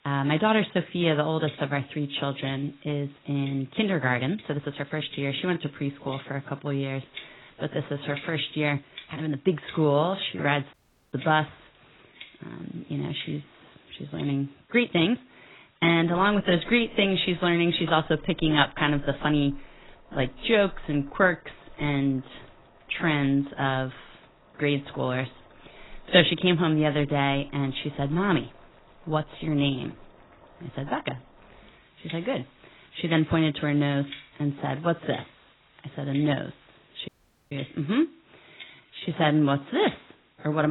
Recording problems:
garbled, watery; badly; nothing above 4 kHz
household noises; faint; throughout; 25 dB below the speech
uneven, jittery; strongly; from 4 to 40 s
audio cutting out; at 11 s and at 37 s
abrupt cut into speech; at the end

